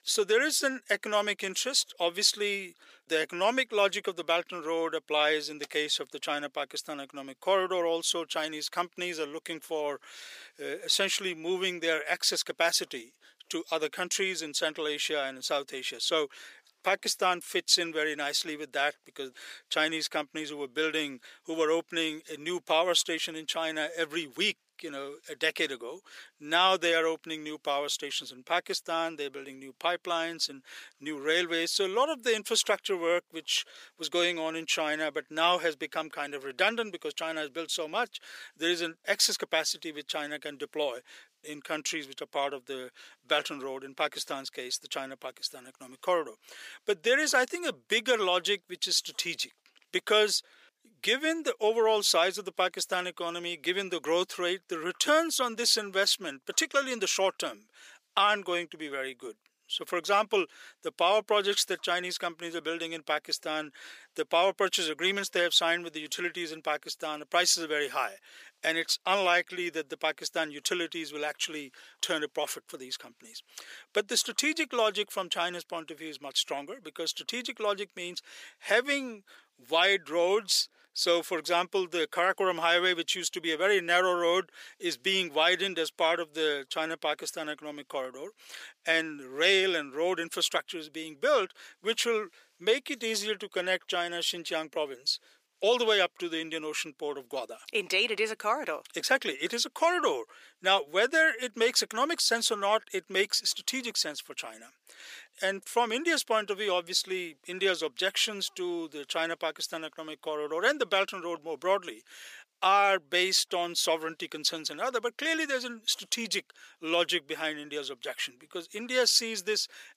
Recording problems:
thin; very; fading below 400 Hz

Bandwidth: 15 kHz